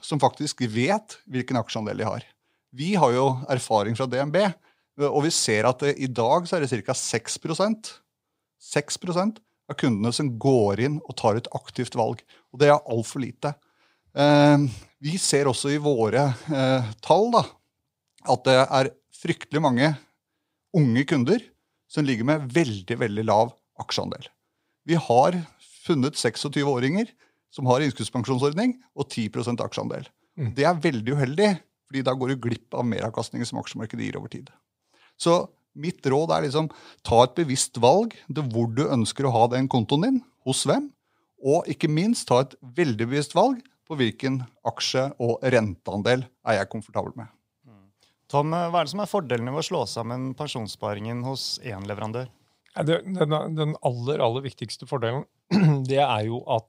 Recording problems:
none

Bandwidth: 15.5 kHz